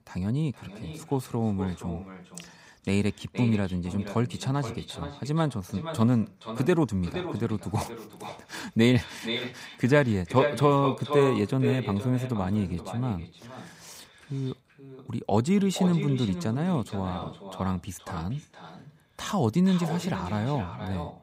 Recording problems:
echo of what is said; strong; throughout; 470 ms later, 10 dB below the speech

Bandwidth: 15.5 kHz